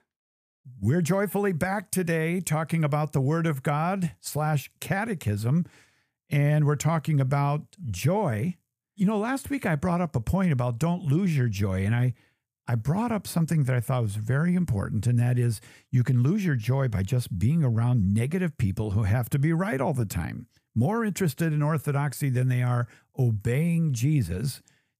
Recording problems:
none

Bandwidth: 15 kHz